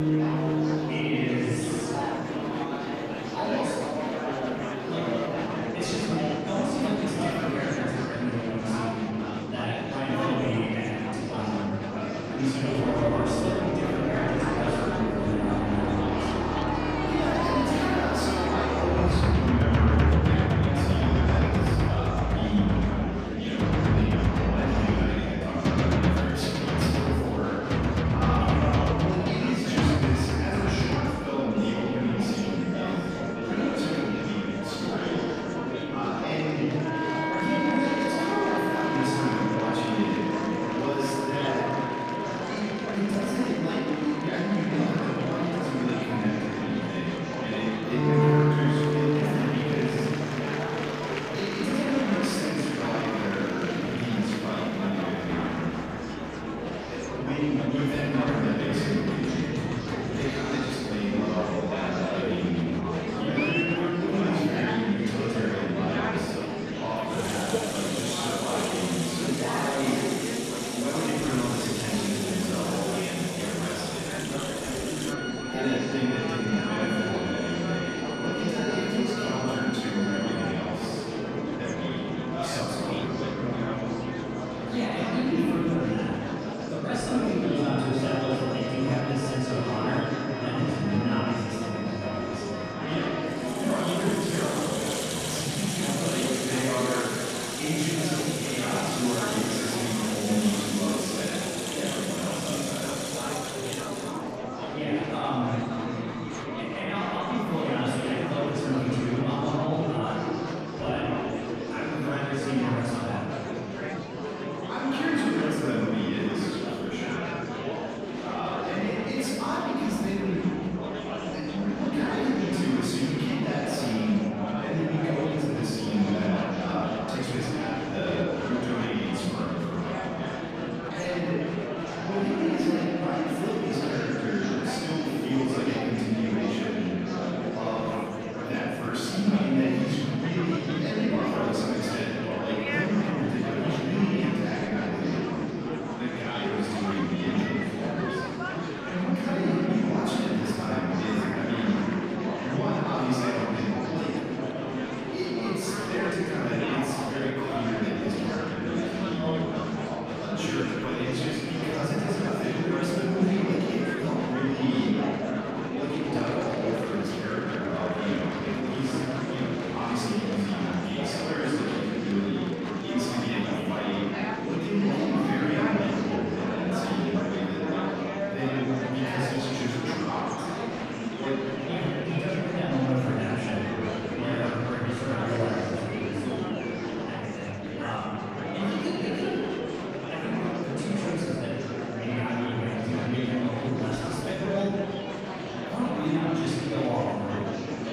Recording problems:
room echo; strong; dies away in 2.2 s
off-mic speech; far
background music; loud; until 1:44; 1 dB below the speech
murmuring crowd; loud; throughout; 3 dB below the speech

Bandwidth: 14.5 kHz